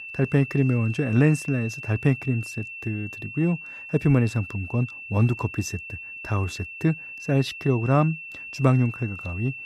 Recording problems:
high-pitched whine; noticeable; throughout; 2.5 kHz, 10 dB below the speech

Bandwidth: 14.5 kHz